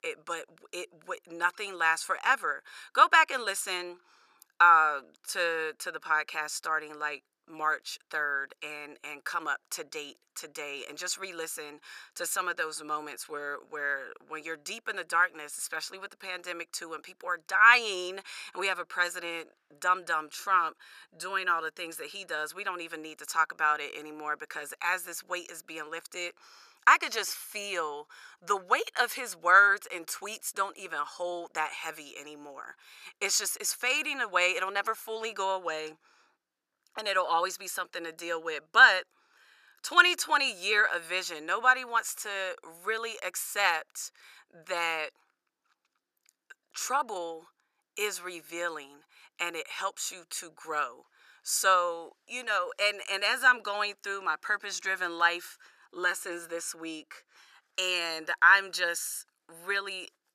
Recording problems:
thin; very; fading below 600 Hz

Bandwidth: 14.5 kHz